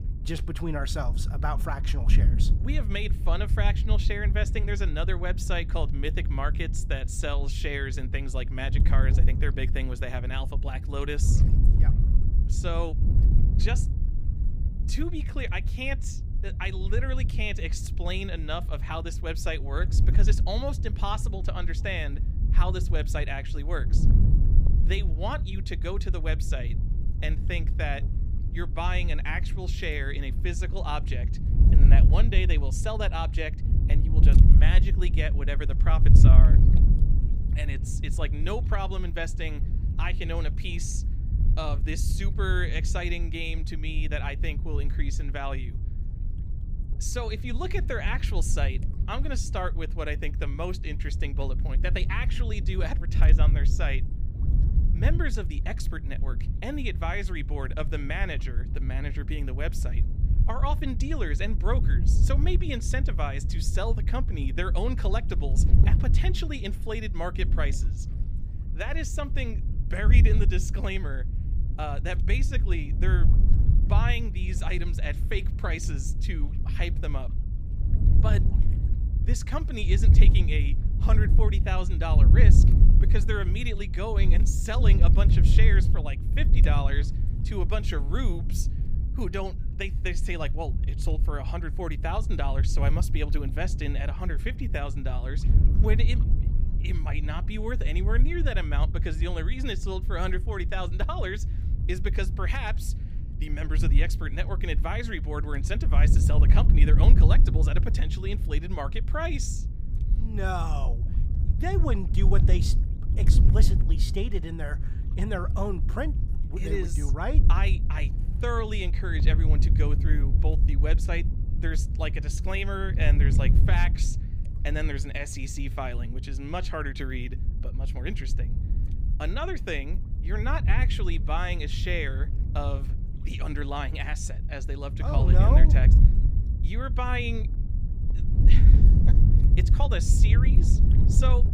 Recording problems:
wind noise on the microphone; heavy; 9 dB below the speech

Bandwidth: 15.5 kHz